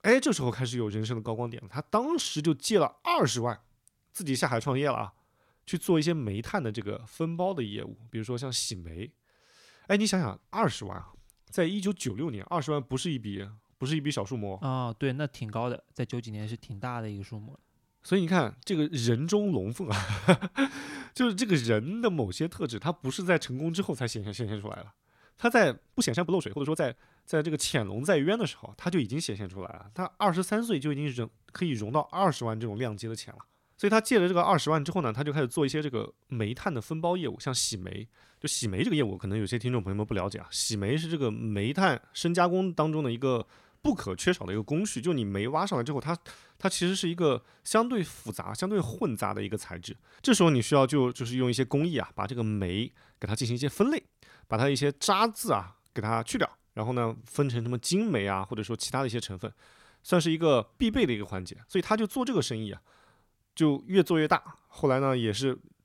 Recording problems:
uneven, jittery; strongly; from 7 s to 1:02

